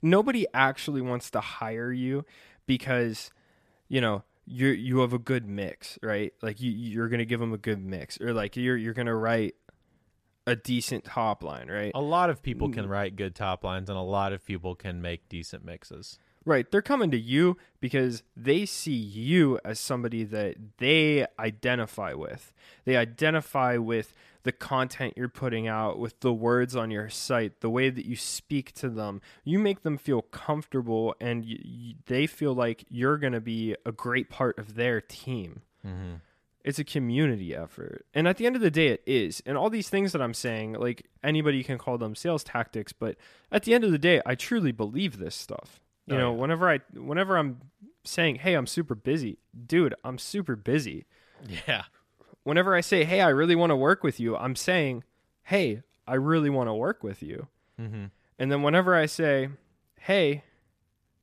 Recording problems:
none

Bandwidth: 14.5 kHz